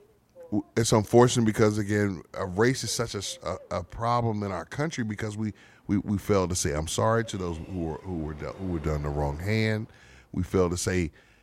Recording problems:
train or aircraft noise; faint; throughout; 25 dB below the speech

